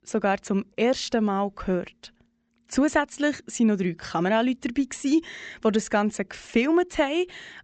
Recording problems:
high frequencies cut off; noticeable; nothing above 8 kHz

